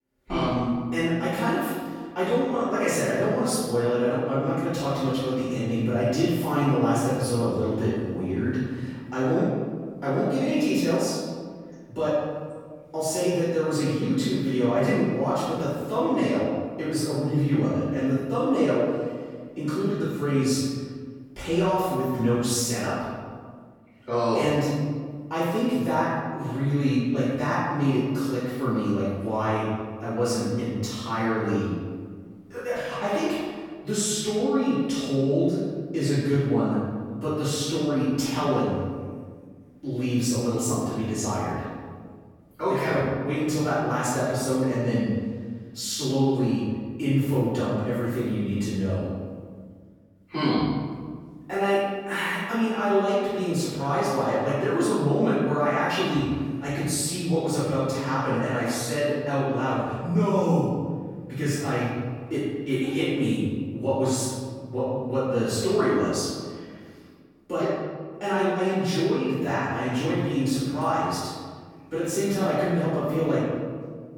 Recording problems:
room echo; strong; dies away in 1.6 s
off-mic speech; far

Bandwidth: 17.5 kHz